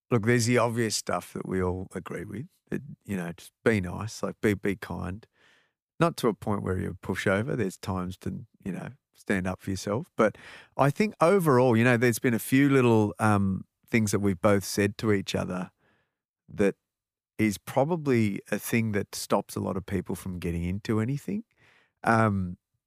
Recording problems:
none

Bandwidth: 15 kHz